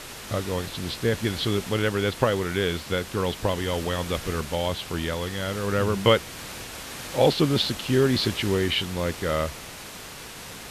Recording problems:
muffled; very slightly; fading above 4 kHz
hiss; noticeable; throughout; 10 dB below the speech

